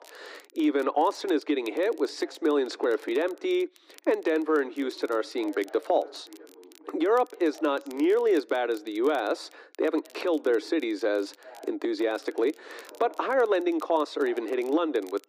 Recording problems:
muffled; slightly; fading above 2.5 kHz
thin; somewhat; fading below 300 Hz
voice in the background; faint; throughout; 25 dB below the speech
crackle, like an old record; faint; 30 dB below the speech

